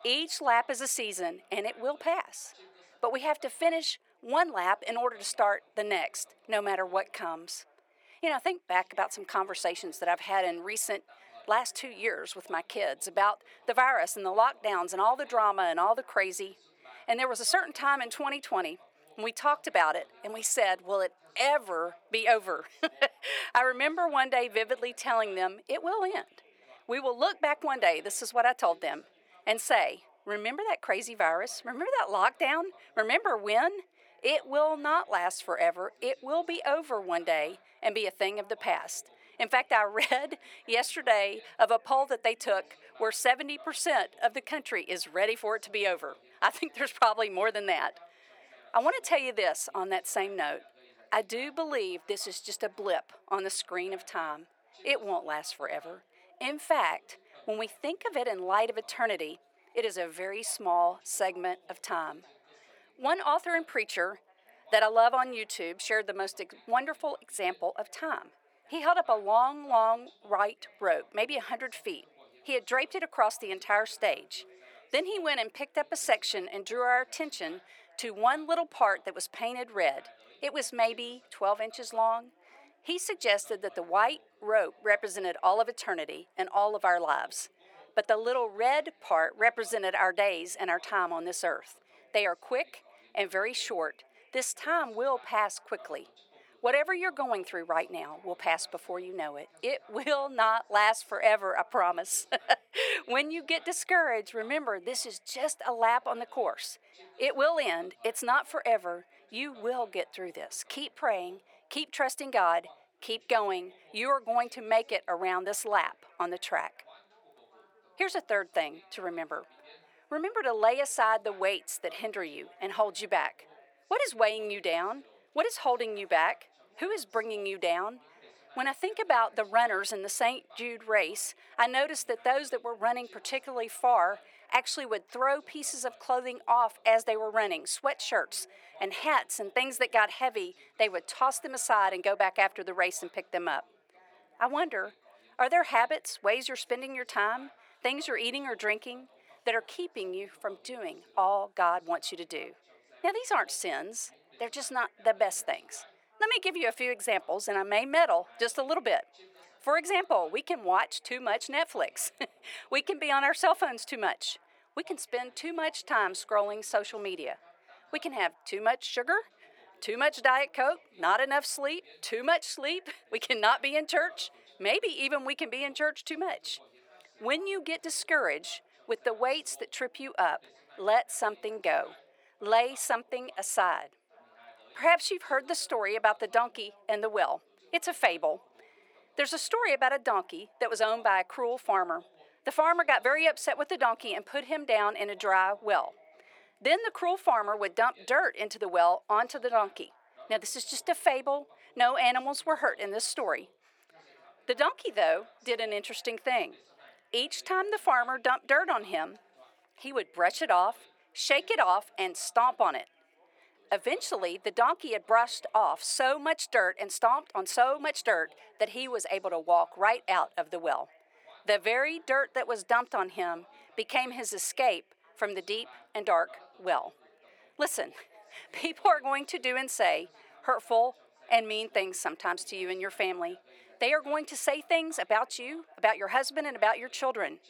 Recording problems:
thin; very; fading below 400 Hz
background chatter; faint; throughout; 3 voices, 30 dB below the speech

